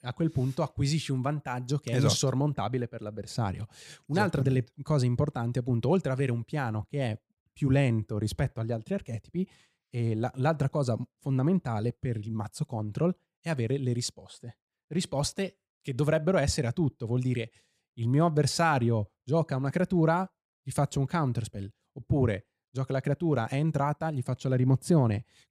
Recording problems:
none

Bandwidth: 14.5 kHz